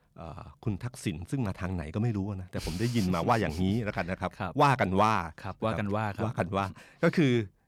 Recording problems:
none

